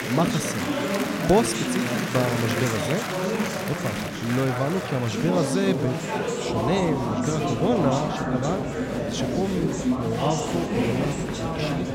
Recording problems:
murmuring crowd; very loud; throughout; 1 dB above the speech

